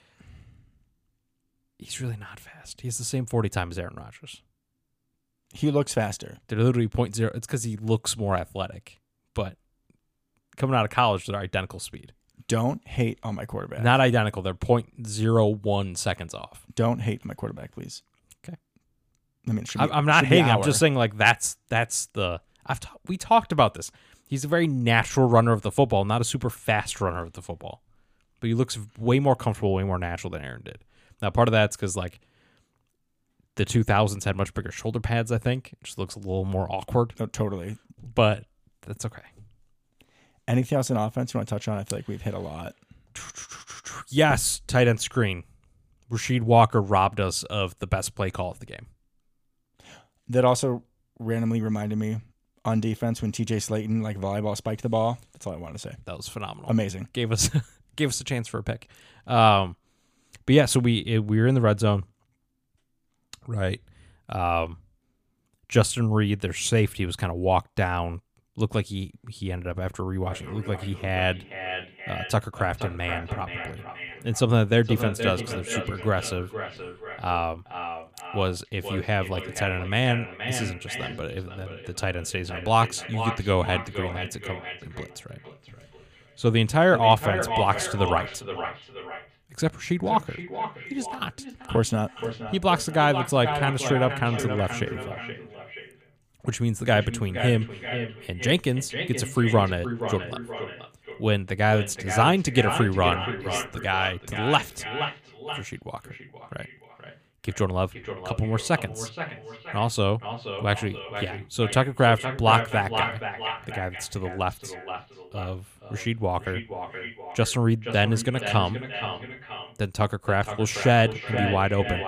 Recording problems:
echo of what is said; strong; from 1:10 on; 470 ms later, 8 dB below the speech

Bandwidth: 15 kHz